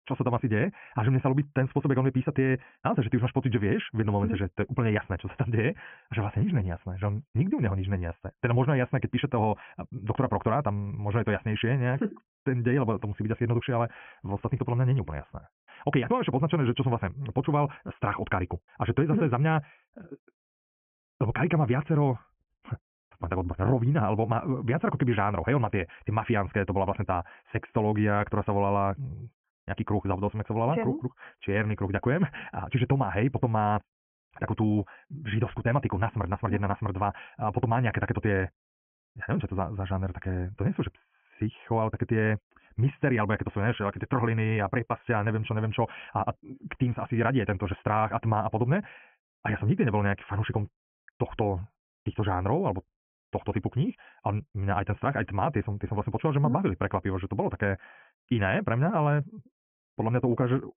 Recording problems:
high frequencies cut off; severe; nothing above 3 kHz
wrong speed, natural pitch; too fast; 1.7 times normal speed

